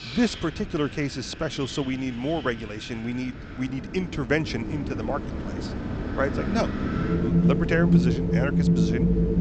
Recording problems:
high frequencies cut off; noticeable; nothing above 8 kHz
wind in the background; very loud; throughout; 3 dB above the speech

